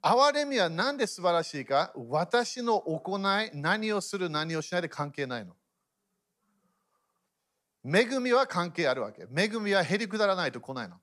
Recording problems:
none

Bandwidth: 14.5 kHz